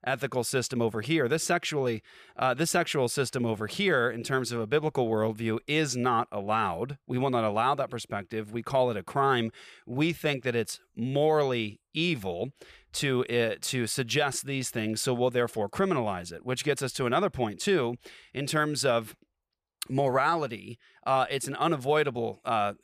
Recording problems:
none

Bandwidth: 14.5 kHz